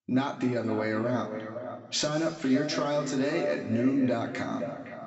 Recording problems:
echo of what is said; strong; throughout; 510 ms later, 9 dB below the speech
high frequencies cut off; noticeable; nothing above 8 kHz
room echo; slight; dies away in 2.2 s
off-mic speech; somewhat distant

